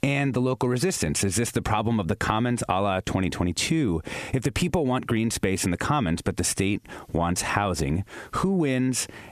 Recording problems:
squashed, flat; heavily

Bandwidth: 14 kHz